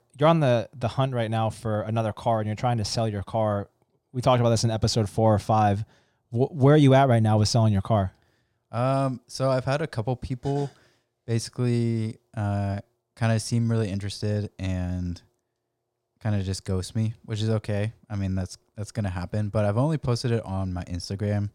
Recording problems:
none

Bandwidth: 16 kHz